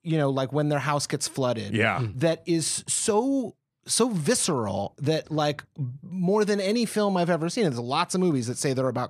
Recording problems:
none

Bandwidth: 13.5 kHz